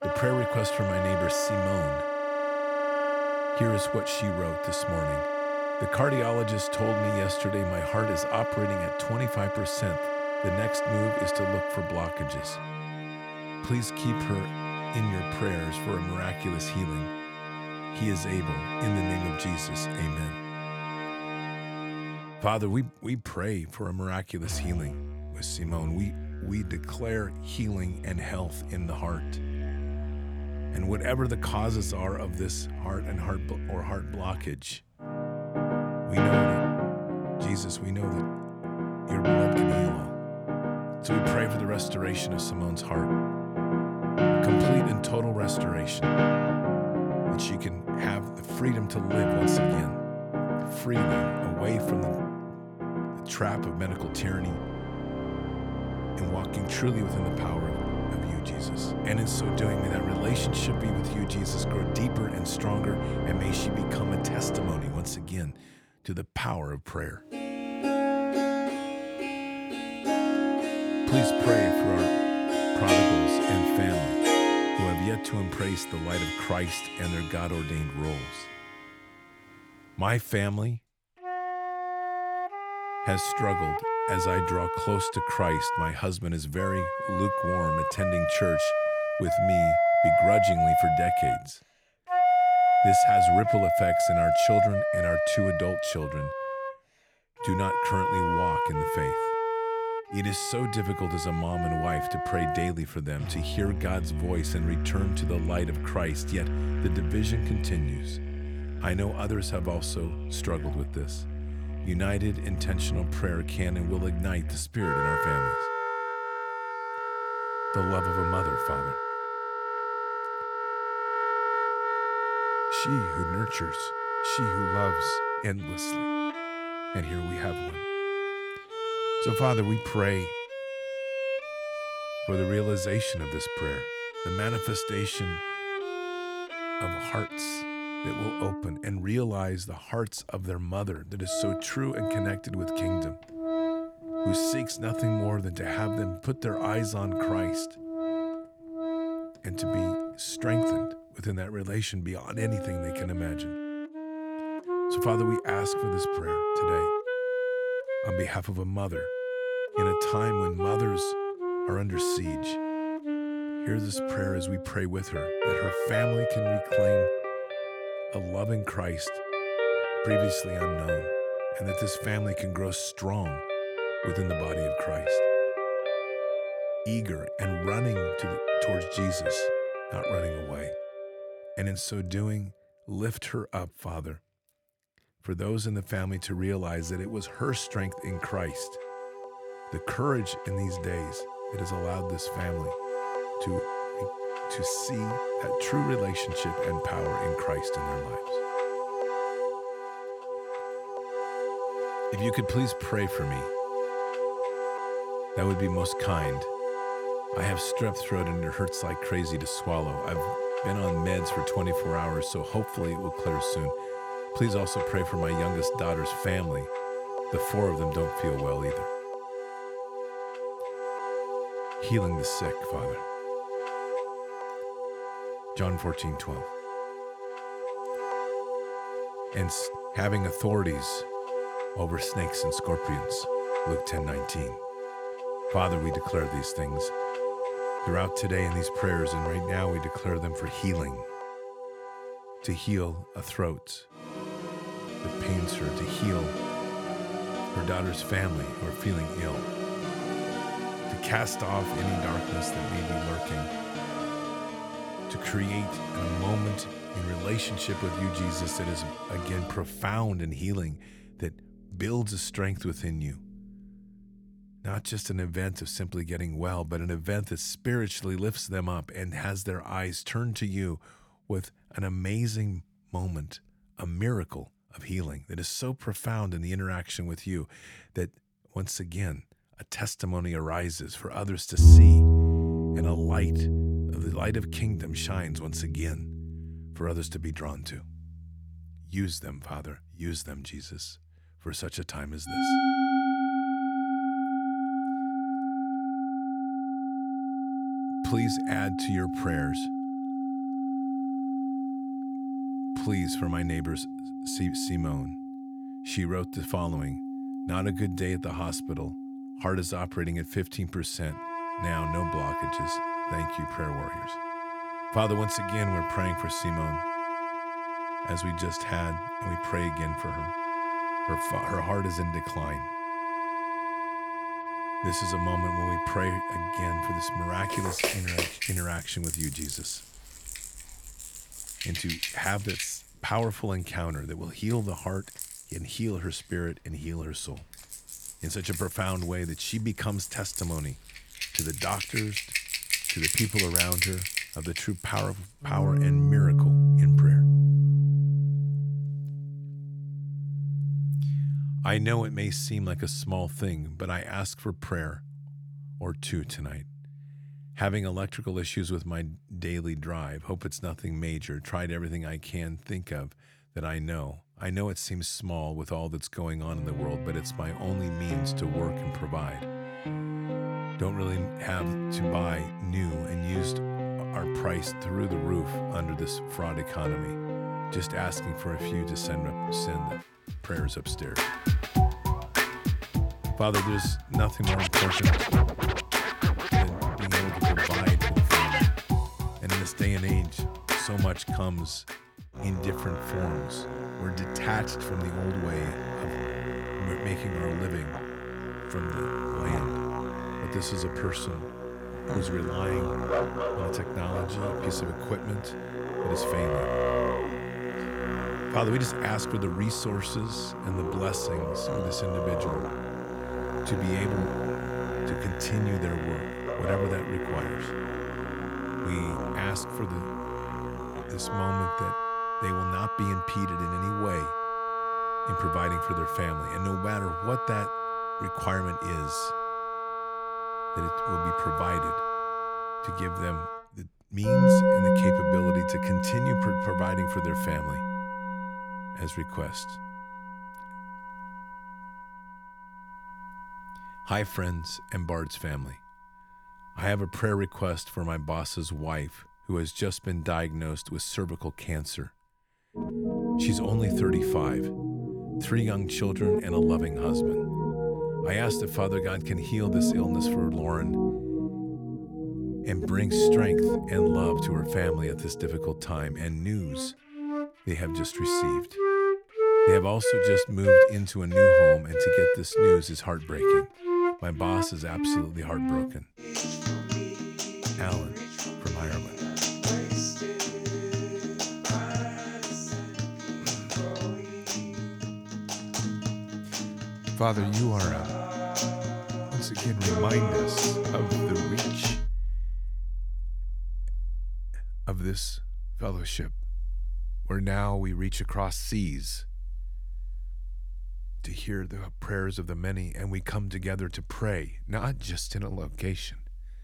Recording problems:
background music; very loud; throughout; 3 dB above the speech

